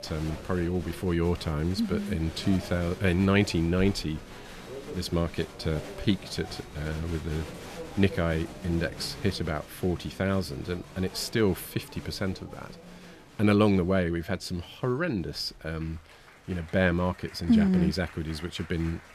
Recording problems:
crowd noise; noticeable; throughout; 15 dB below the speech

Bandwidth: 14.5 kHz